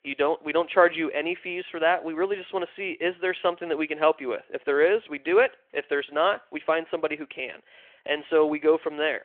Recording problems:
phone-call audio

